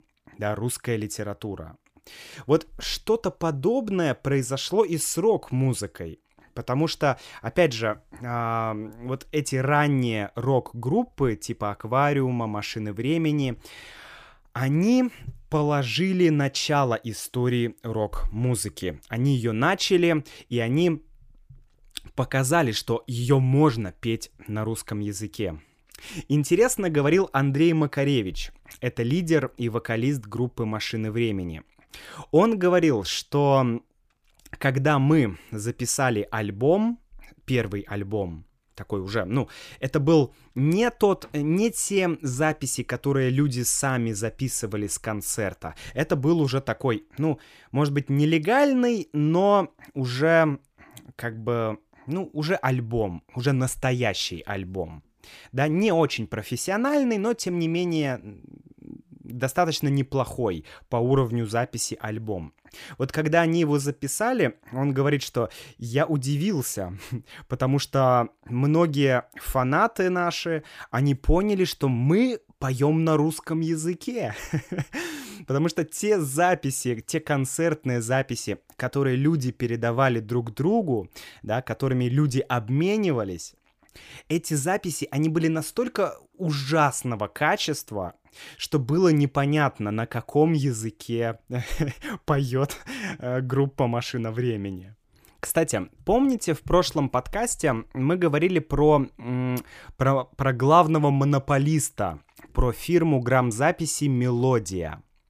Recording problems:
none

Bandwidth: 15 kHz